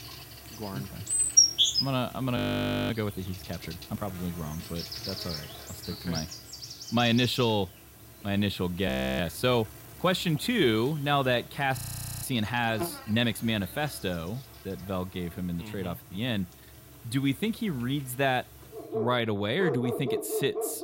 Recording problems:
animal sounds; very loud; throughout; as loud as the speech
audio freezing; at 2.5 s for 0.5 s, at 9 s and at 12 s

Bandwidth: 16 kHz